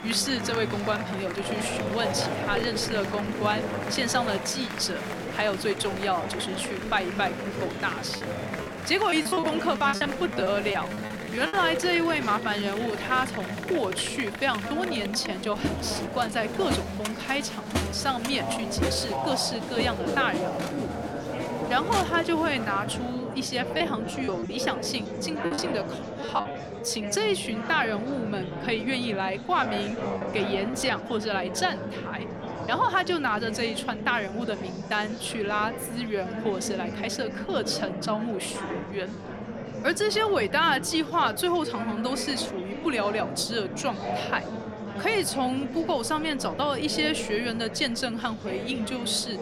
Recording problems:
murmuring crowd; loud; throughout; 5 dB below the speech
choppy; very; from 8 to 12 s, from 24 to 26 s and from 30 to 31 s; 15% of the speech affected

